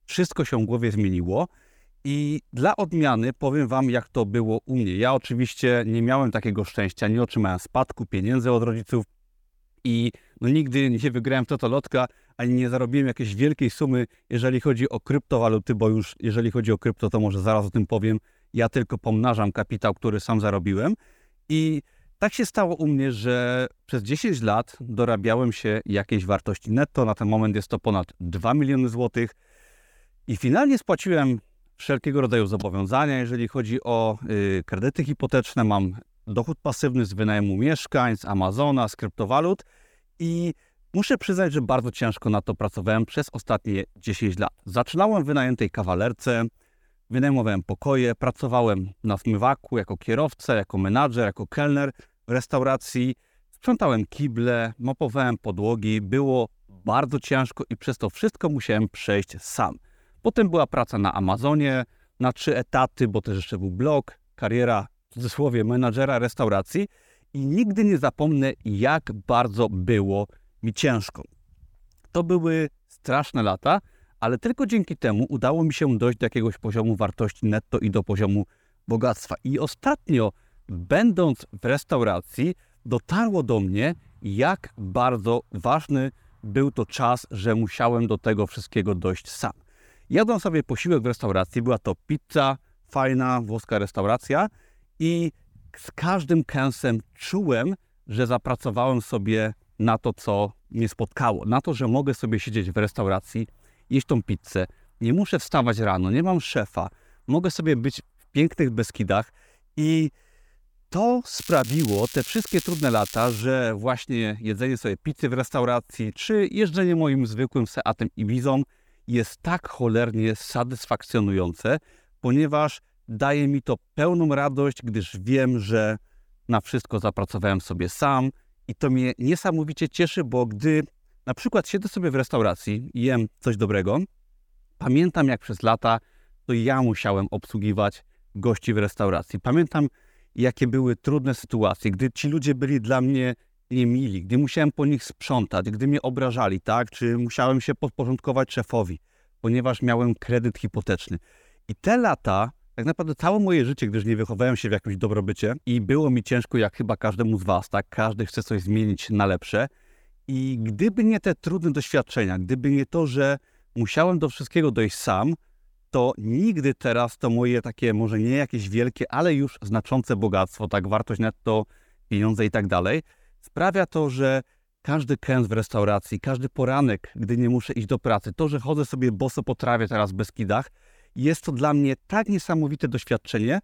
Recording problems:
crackling; noticeable; from 1:51 to 1:53; 10 dB below the speech

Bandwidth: 19 kHz